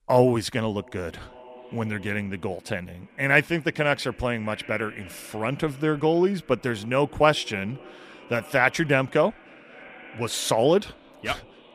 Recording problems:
echo of what is said; faint; throughout; 560 ms later, 20 dB below the speech

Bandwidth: 14.5 kHz